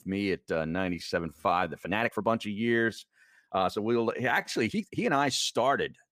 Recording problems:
uneven, jittery; strongly; from 0.5 to 5 s

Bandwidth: 15 kHz